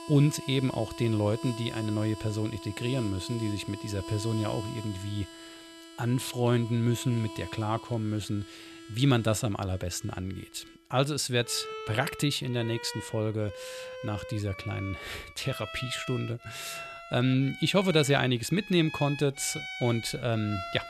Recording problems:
background music; noticeable; throughout; 10 dB below the speech

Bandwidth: 13.5 kHz